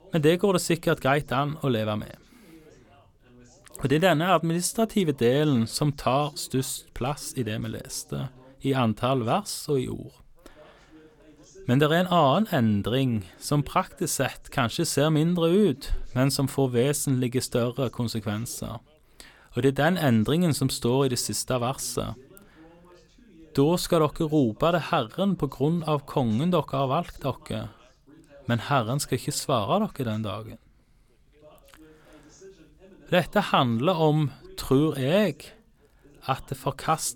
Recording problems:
background chatter; faint; throughout; 2 voices, 30 dB below the speech

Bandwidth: 17.5 kHz